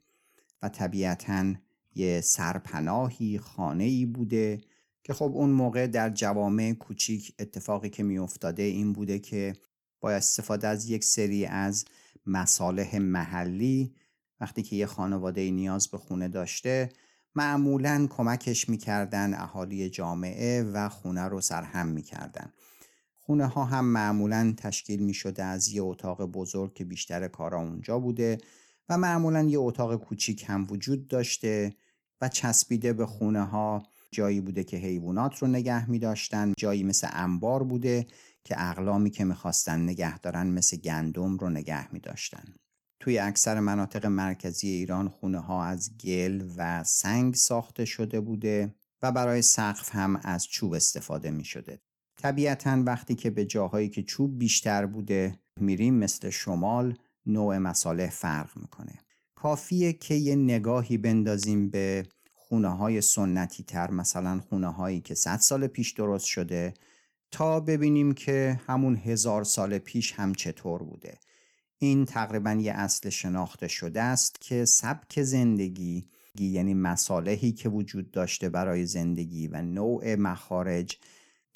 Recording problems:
none

